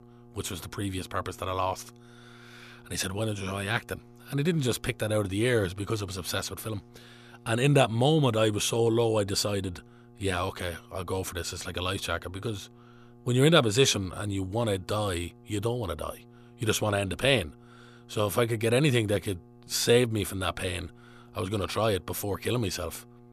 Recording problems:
electrical hum; faint; throughout; 60 Hz, 30 dB below the speech

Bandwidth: 14.5 kHz